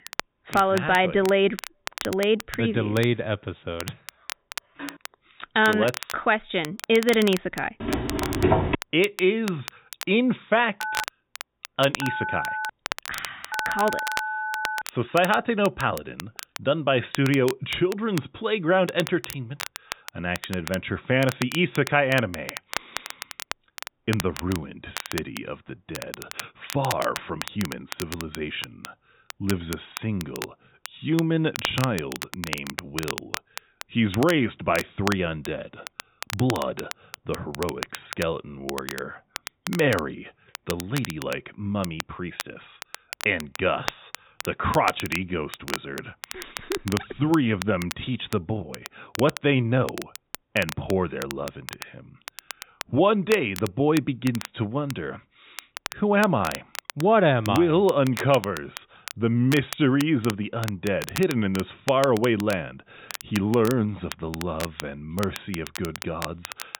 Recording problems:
high frequencies cut off; severe; nothing above 4 kHz
crackle, like an old record; noticeable; 10 dB below the speech
phone ringing; faint; at 5 s; peak 15 dB below the speech
footsteps; loud; at 8 s; peak 4 dB above the speech
phone ringing; noticeable; from 11 to 15 s; peak 3 dB below the speech

